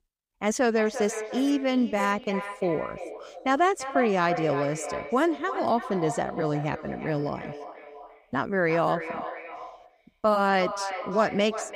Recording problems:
echo of what is said; strong; throughout; 340 ms later, 10 dB below the speech

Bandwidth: 15.5 kHz